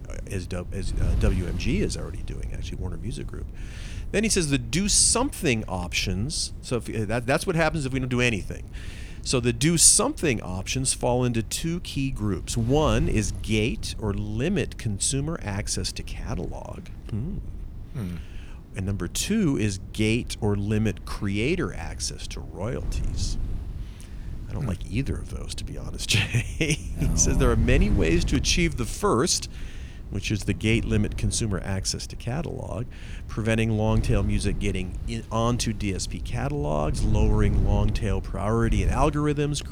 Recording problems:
wind noise on the microphone; occasional gusts; 20 dB below the speech

